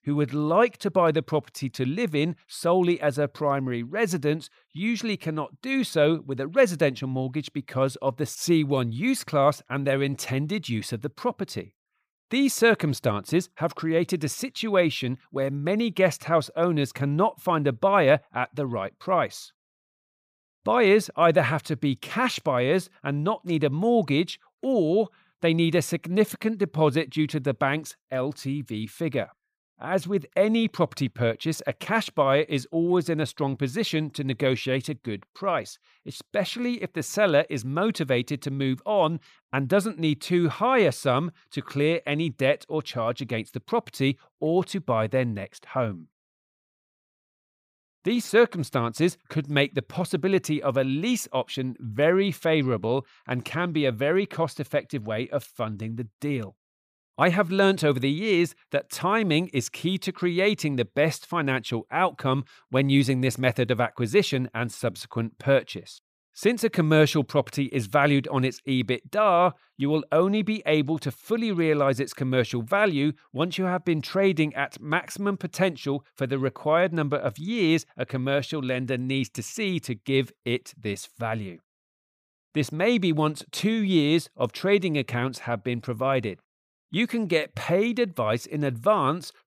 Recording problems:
none

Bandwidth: 15 kHz